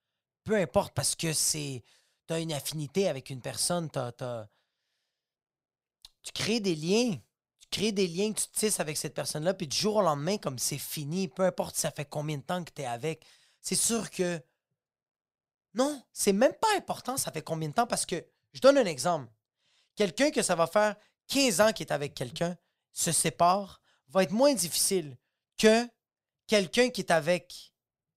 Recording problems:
none

